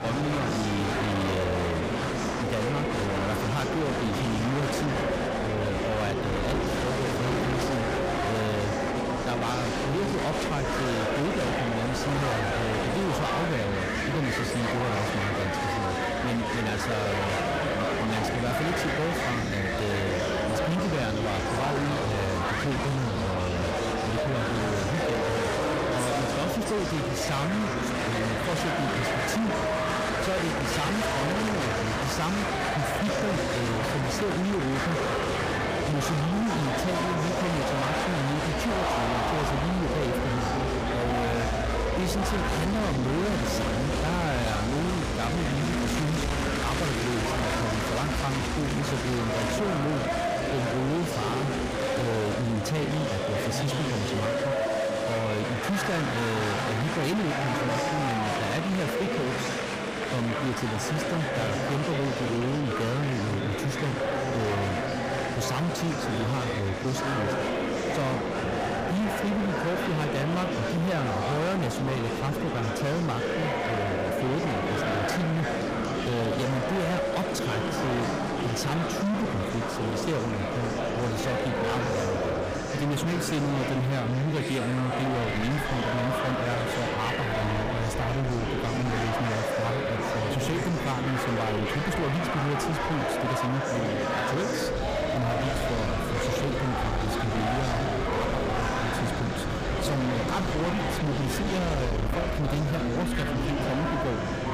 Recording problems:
distortion; heavy; 36% of the sound clipped
murmuring crowd; very loud; throughout; as loud as the speech
train or aircraft noise; loud; throughout; 5 dB below the speech
background music; faint; throughout; 20 dB below the speech

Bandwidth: 15 kHz